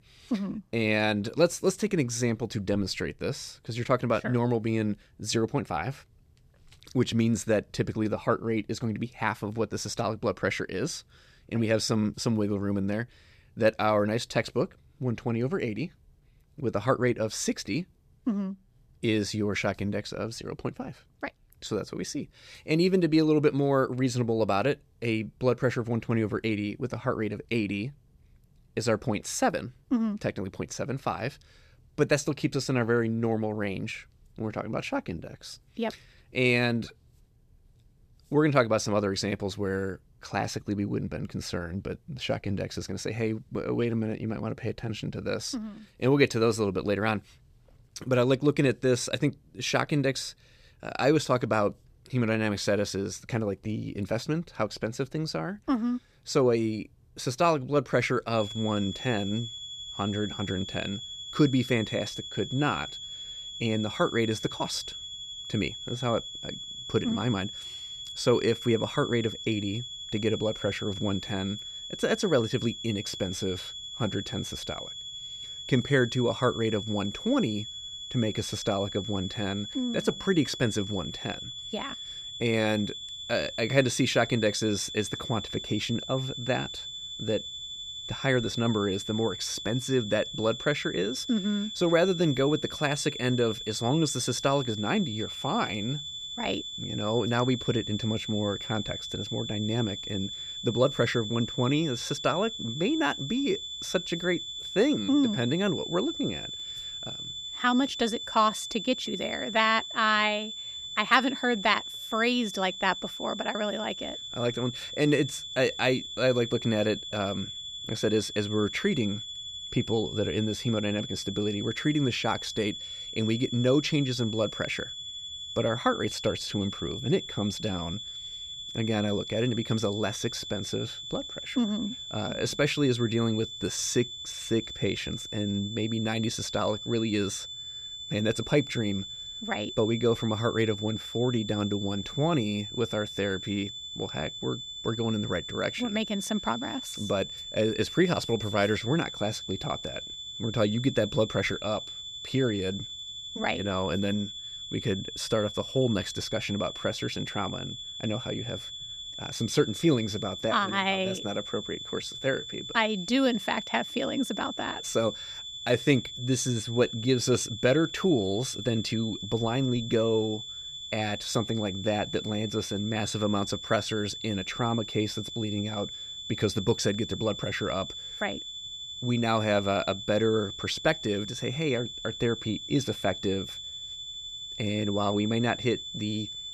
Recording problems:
high-pitched whine; loud; from 58 s on; 3.5 kHz, 8 dB below the speech

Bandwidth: 14.5 kHz